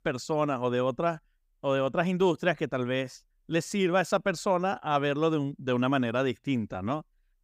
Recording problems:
none

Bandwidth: 15.5 kHz